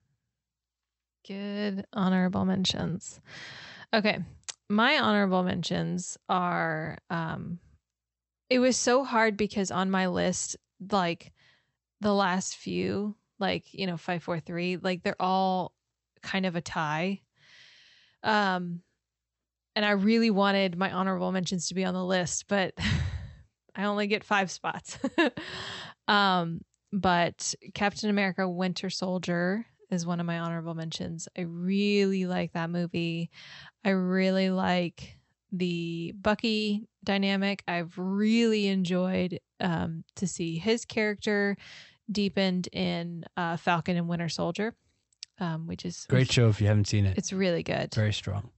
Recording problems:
high frequencies cut off; noticeable; nothing above 8 kHz

